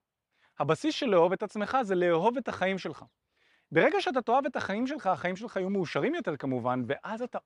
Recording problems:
none

